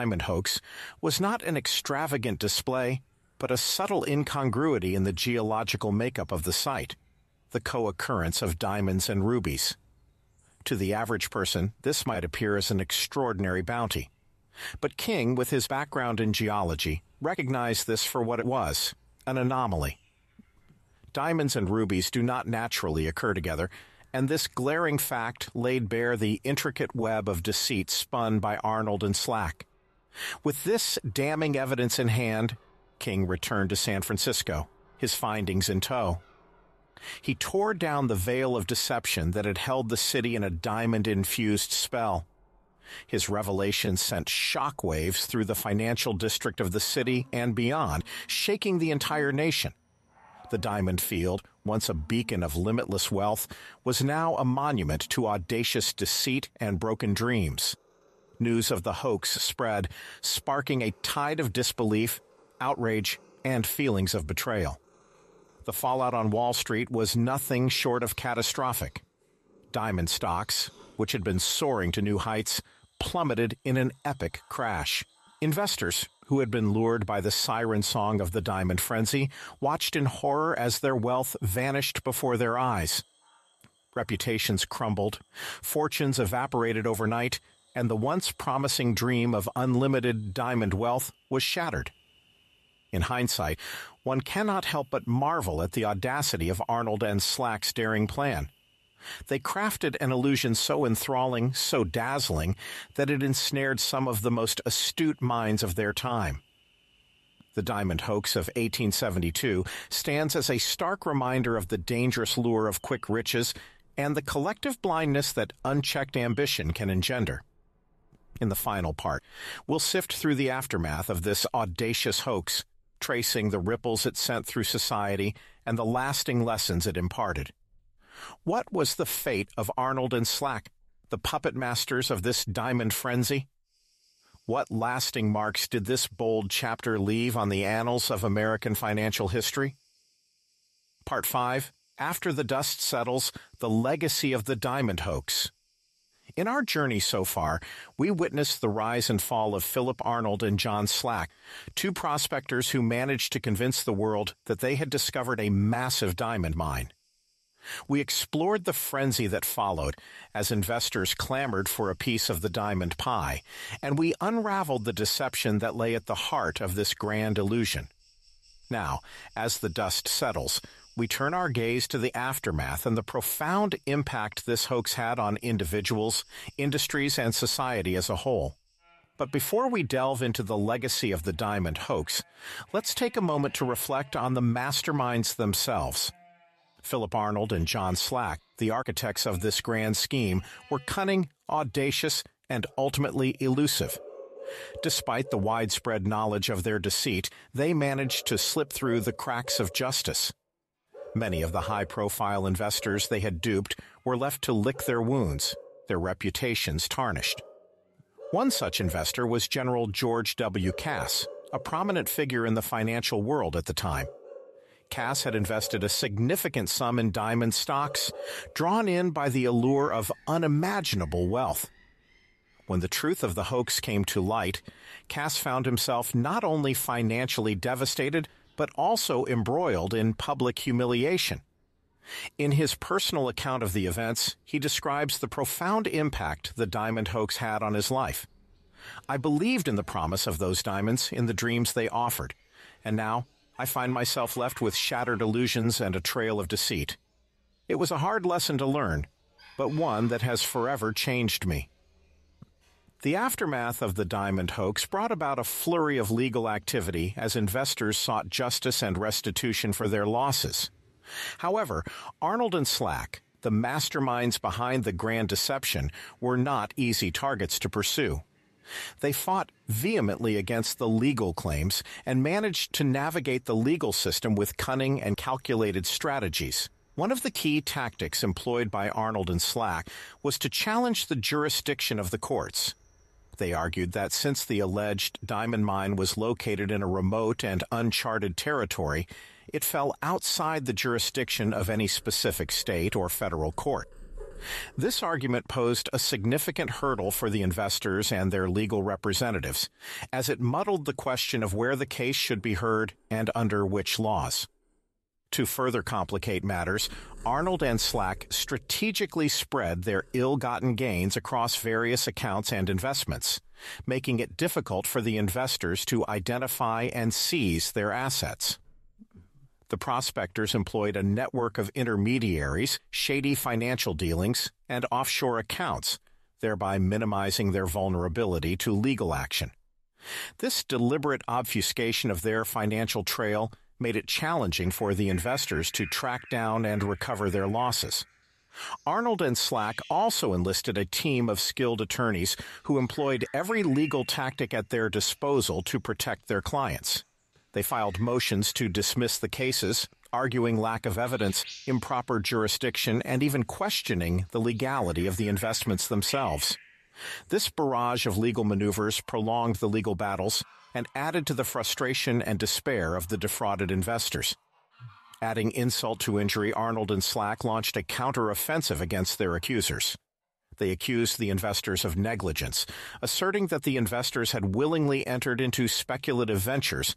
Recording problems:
animal sounds; faint; throughout; 25 dB below the speech
abrupt cut into speech; at the start

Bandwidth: 13.5 kHz